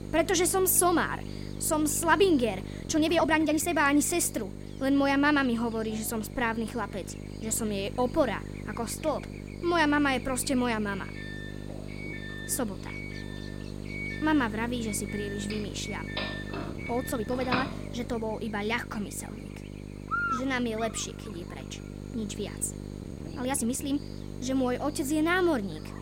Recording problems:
electrical hum; noticeable; throughout; 50 Hz, 15 dB below the speech
uneven, jittery; strongly; from 3 to 24 s
doorbell; noticeable; from 12 to 18 s; peak 3 dB below the speech

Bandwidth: 16 kHz